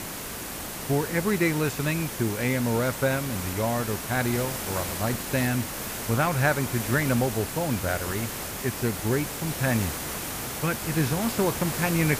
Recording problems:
hiss; loud; throughout; 4 dB below the speech

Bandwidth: 15 kHz